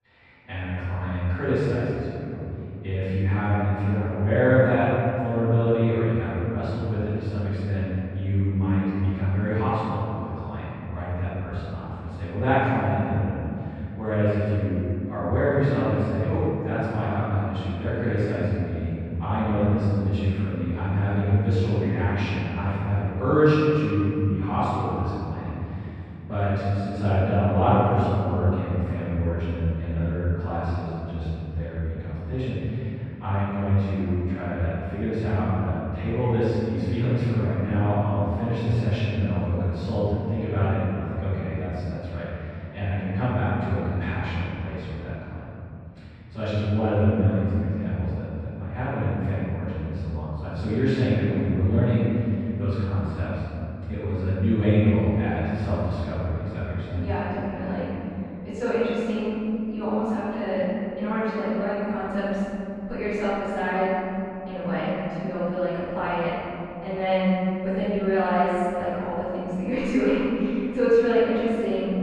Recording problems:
room echo; strong; dies away in 3 s
off-mic speech; far
muffled; very; fading above 2.5 kHz

